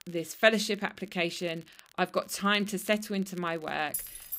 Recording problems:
crackle, like an old record; faint; 25 dB below the speech
jangling keys; noticeable; at 4 s; peak 6 dB below the speech

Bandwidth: 15.5 kHz